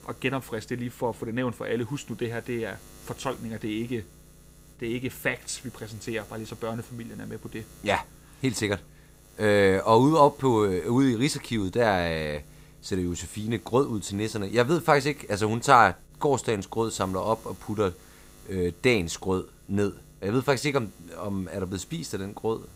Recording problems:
electrical hum; faint; throughout; 60 Hz, 30 dB below the speech

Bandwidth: 15.5 kHz